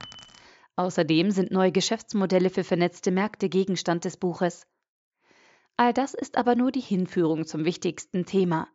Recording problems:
high frequencies cut off; noticeable; nothing above 8 kHz
jangling keys; faint; at the start; peak 15 dB below the speech

